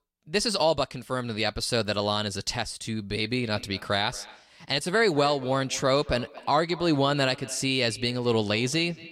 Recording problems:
echo of what is said; faint; from 3 s on; 230 ms later, 20 dB below the speech

